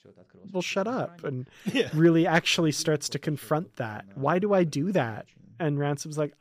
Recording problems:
voice in the background; faint; throughout; 25 dB below the speech

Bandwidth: 15 kHz